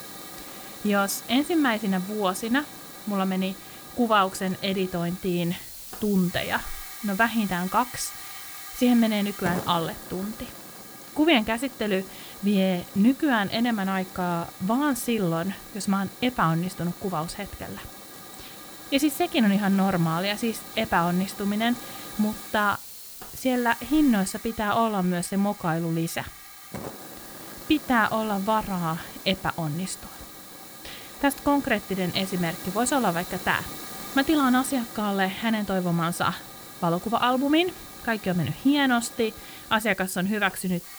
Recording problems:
hiss; noticeable; throughout; 15 dB below the speech

